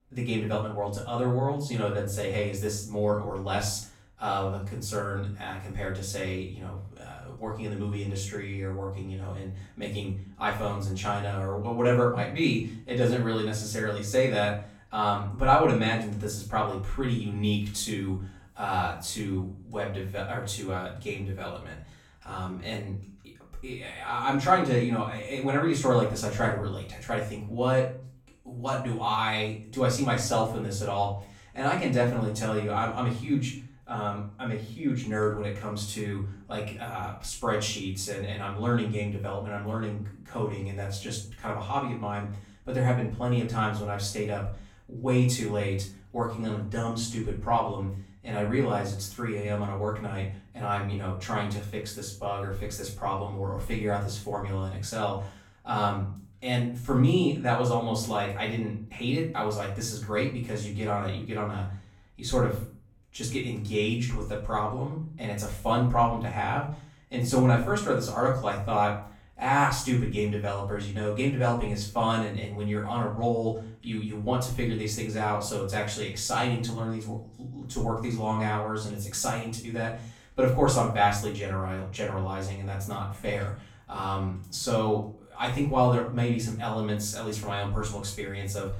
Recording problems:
off-mic speech; far
room echo; noticeable; dies away in 0.4 s

